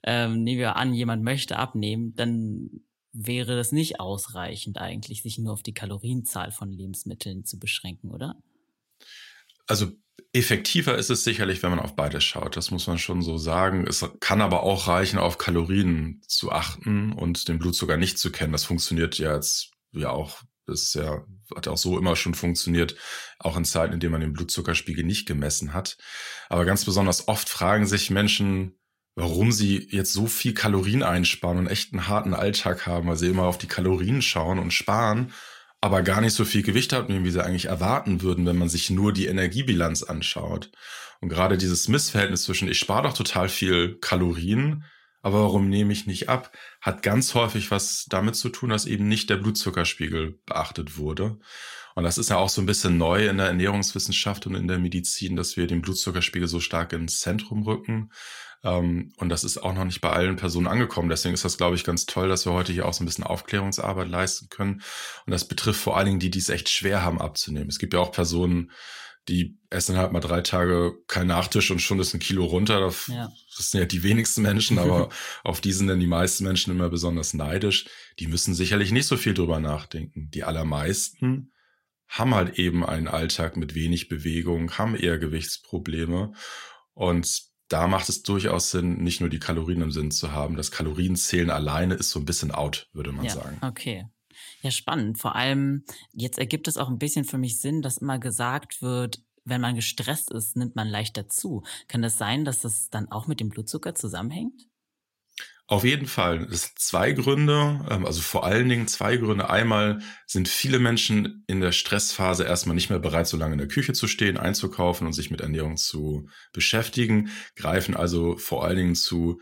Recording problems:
none

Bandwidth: 16 kHz